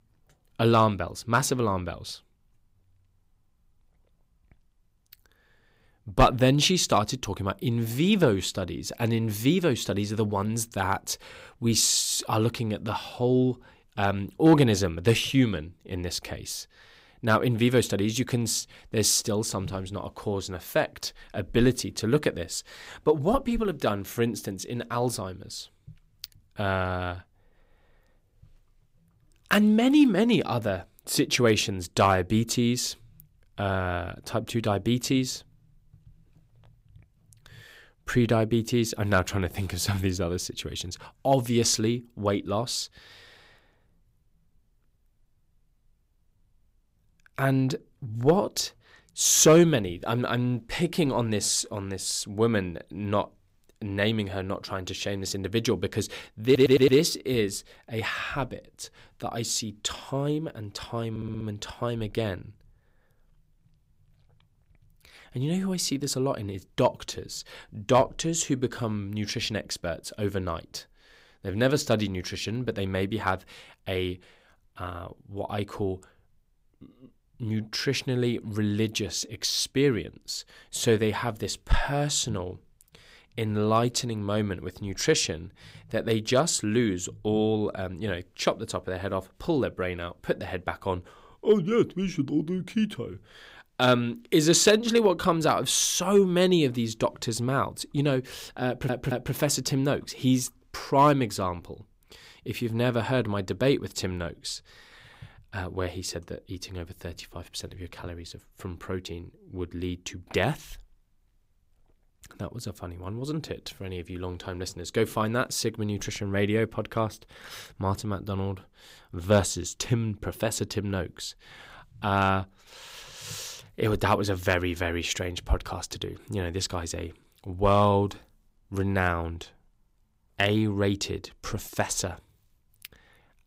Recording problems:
audio stuttering; at 56 s, at 1:01 and at 1:39

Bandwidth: 15.5 kHz